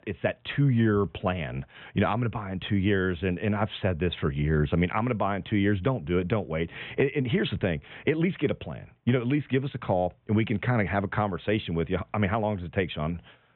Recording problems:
high frequencies cut off; severe; nothing above 3.5 kHz

